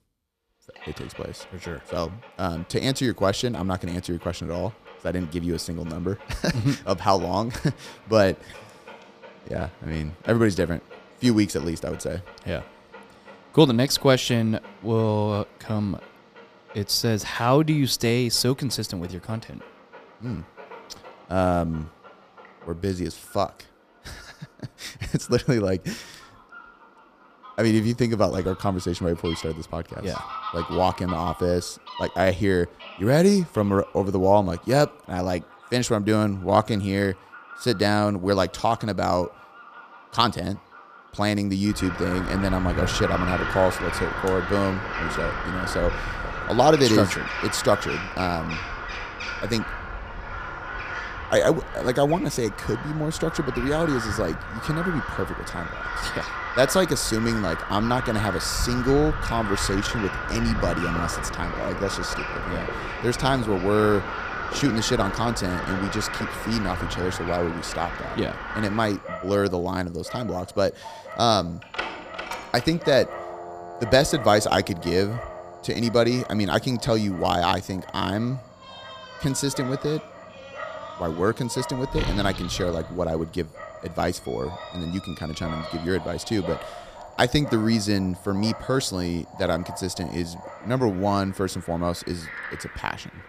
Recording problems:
animal sounds; loud; throughout; 8 dB below the speech

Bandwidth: 15 kHz